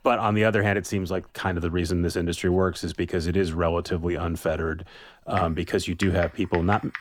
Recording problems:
household noises; noticeable; throughout; 10 dB below the speech

